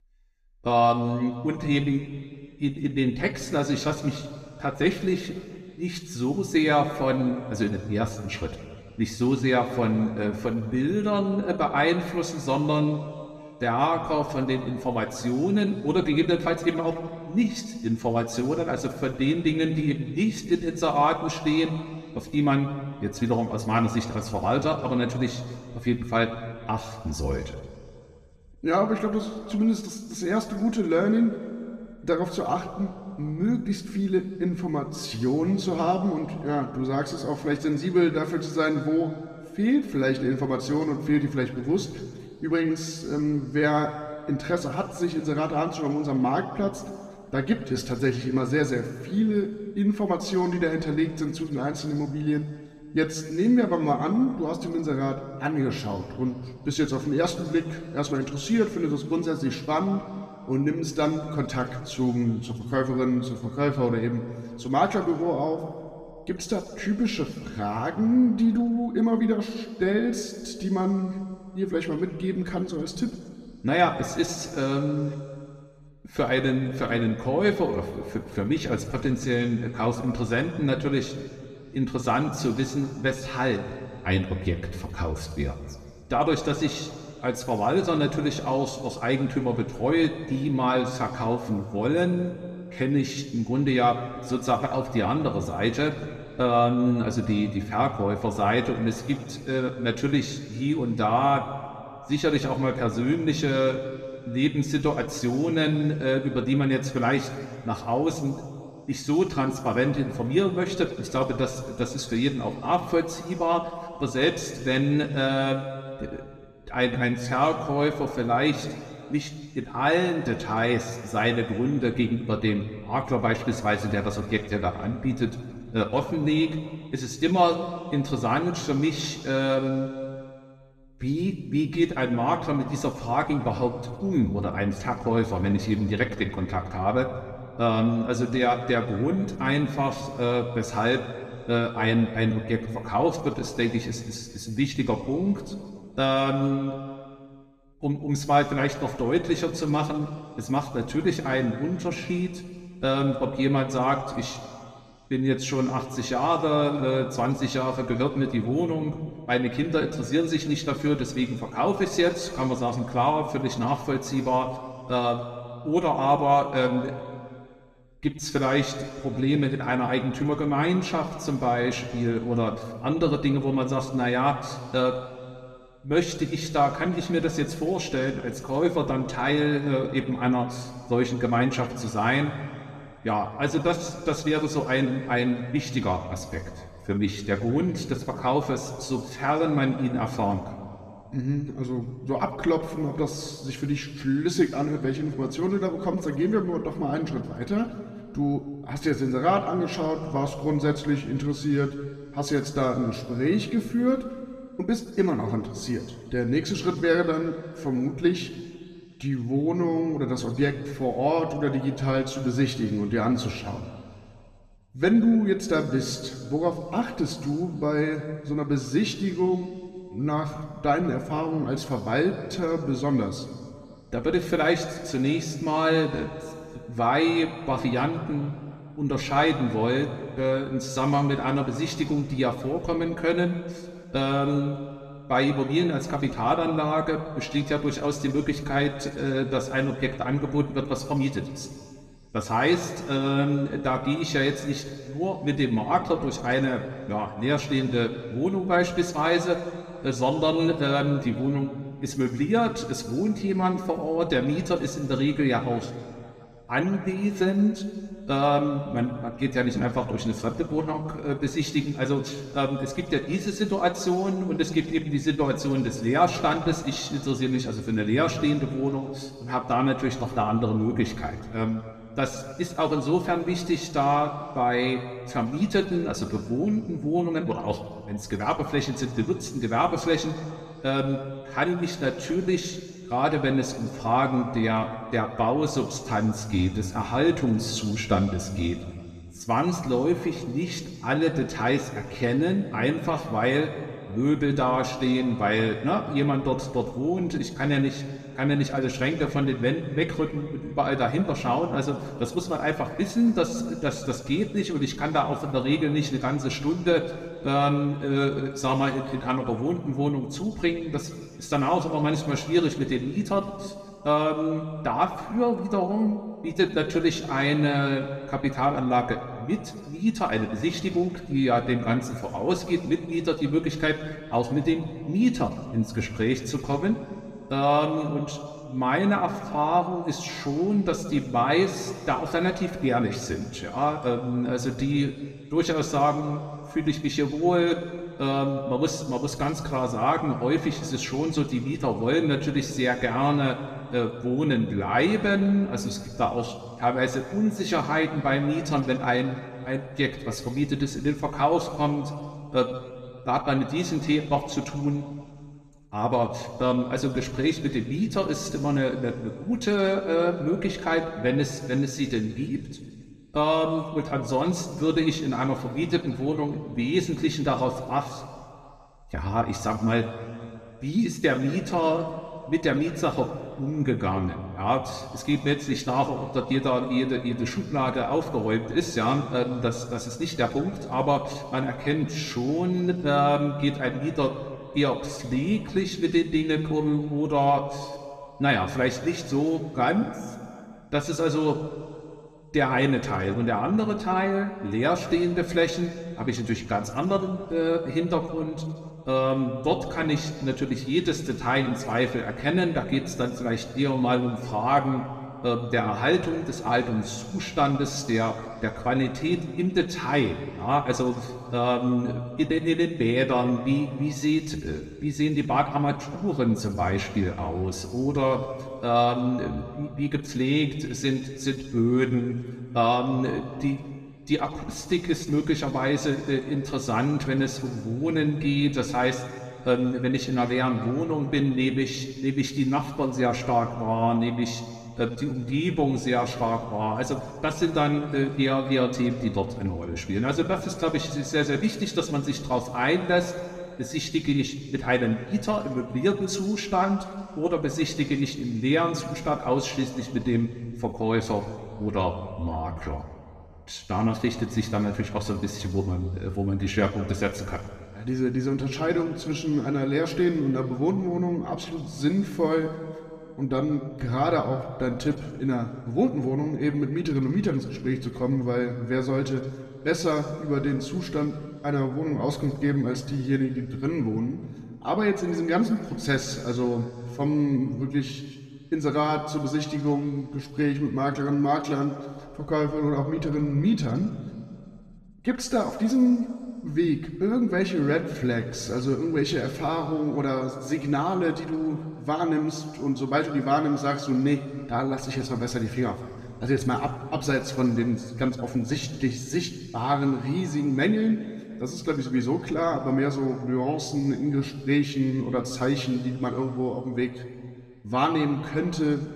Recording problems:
room echo; slight; dies away in 2 s
off-mic speech; somewhat distant

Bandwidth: 14.5 kHz